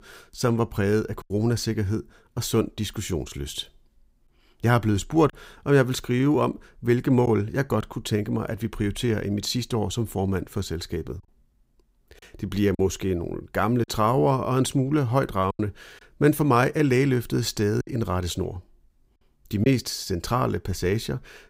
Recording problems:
choppy; occasionally; 2% of the speech affected

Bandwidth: 15.5 kHz